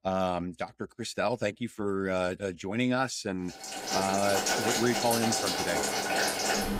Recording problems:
household noises; very loud; from 4 s on; 2 dB above the speech

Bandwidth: 15.5 kHz